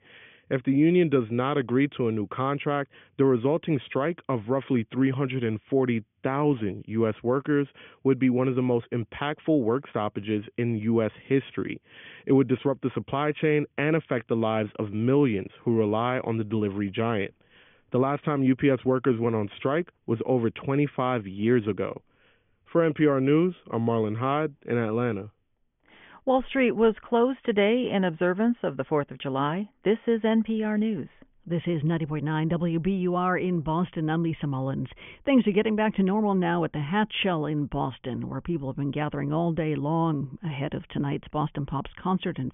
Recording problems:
high frequencies cut off; severe; nothing above 3.5 kHz

